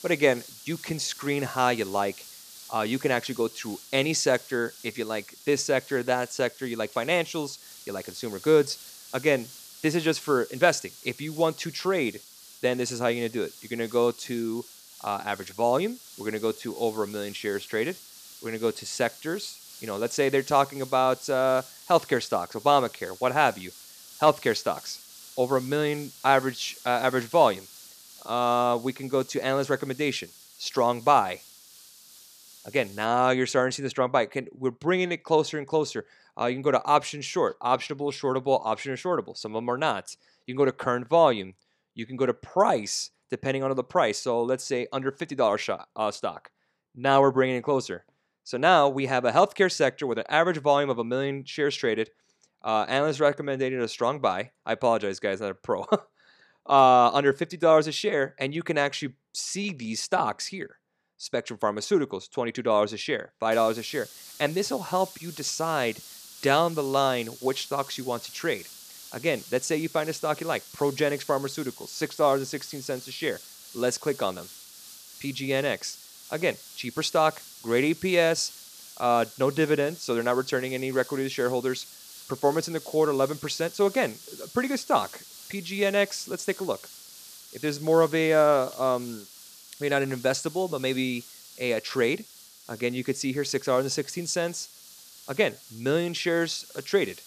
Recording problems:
hiss; noticeable; until 33 s and from 1:04 on; 20 dB below the speech

